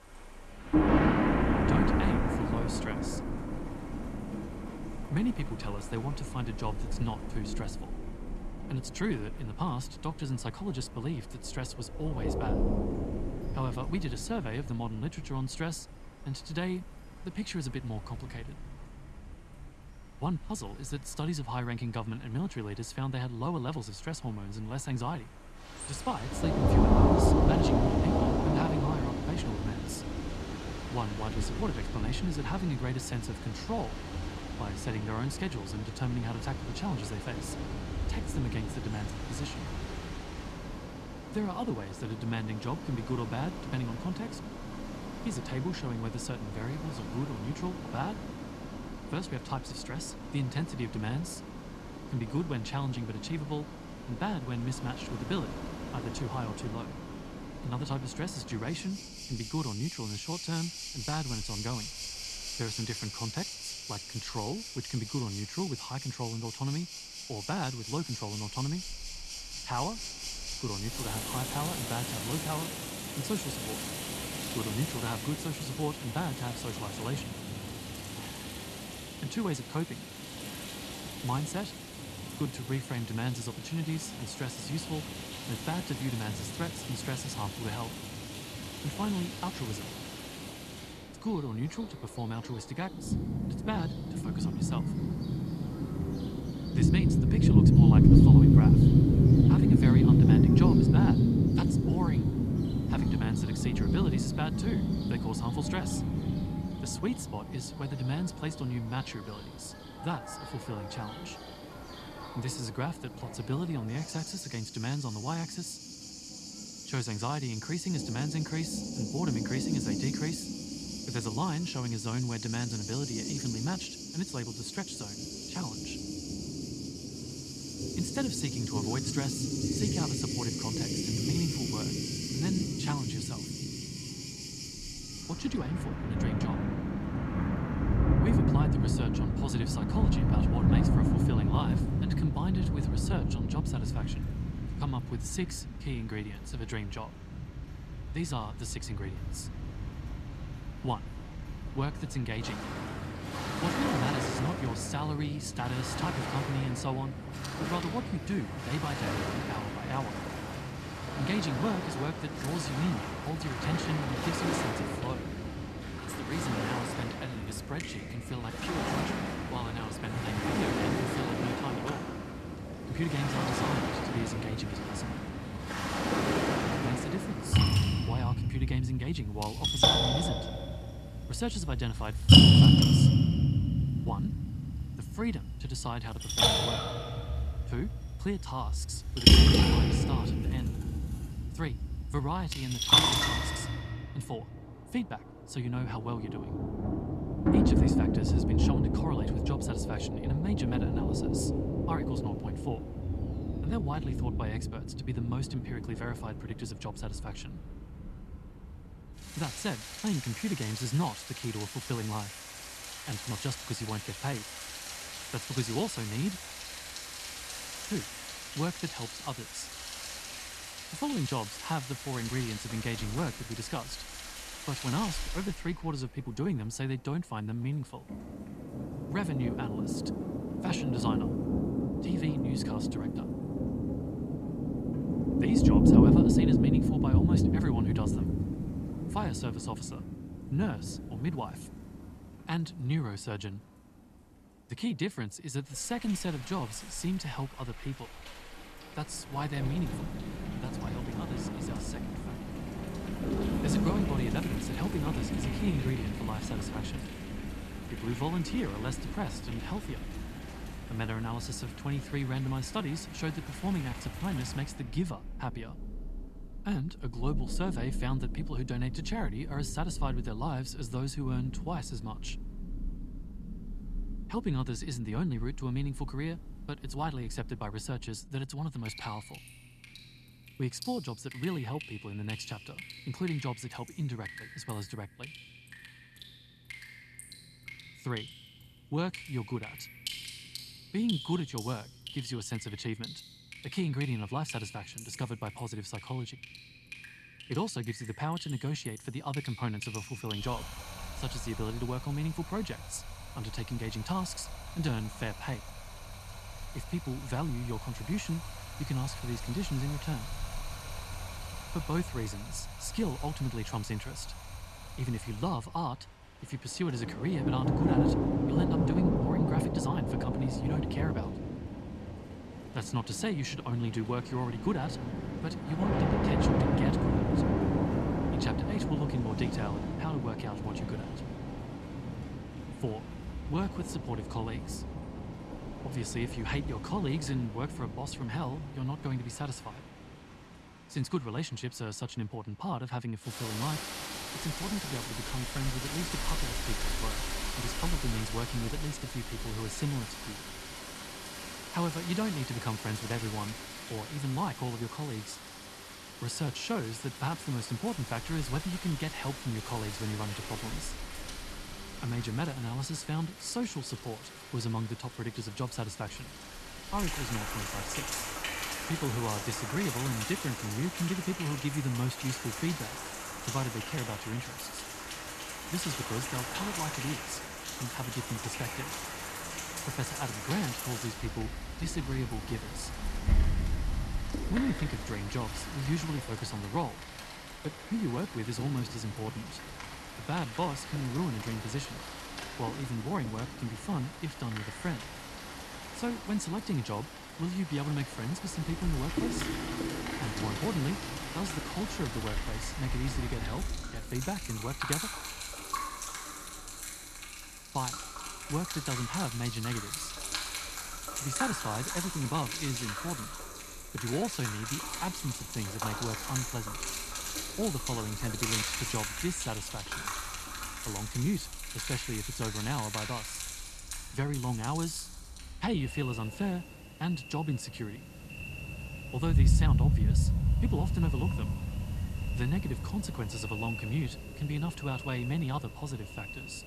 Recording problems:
rain or running water; very loud; throughout; 4 dB above the speech

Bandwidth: 14 kHz